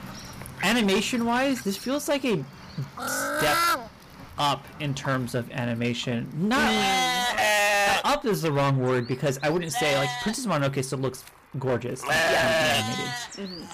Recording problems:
distortion; heavy; 14% of the sound clipped
animal sounds; very loud; throughout; 2 dB above the speech

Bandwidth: 15 kHz